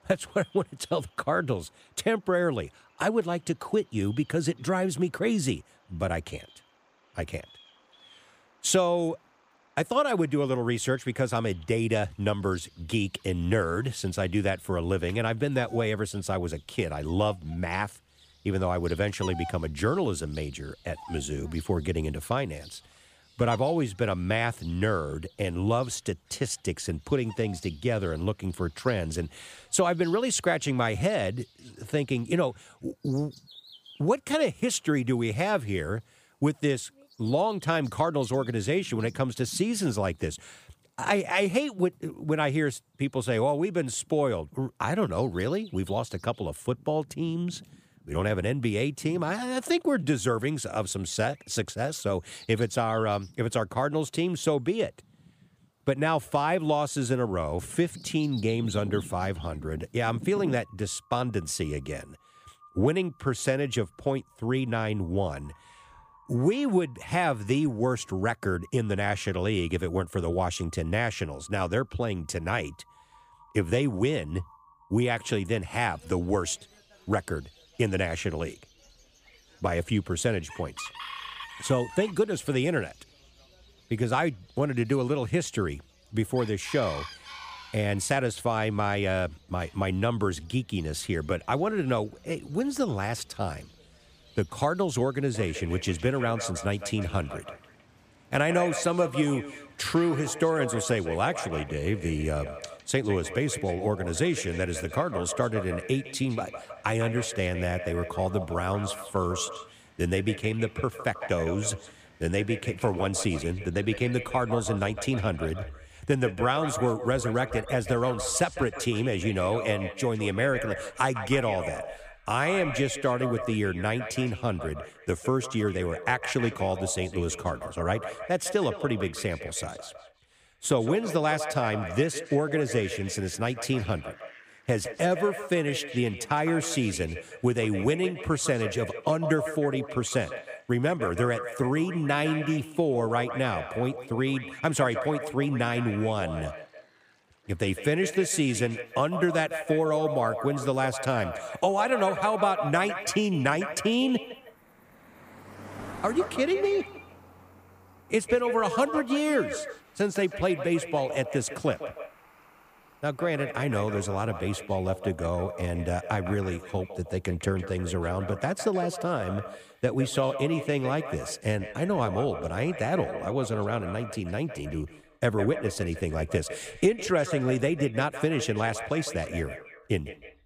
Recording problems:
echo of what is said; strong; from 1:35 on; 160 ms later, 10 dB below the speech
animal sounds; faint; throughout; 20 dB below the speech

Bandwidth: 15 kHz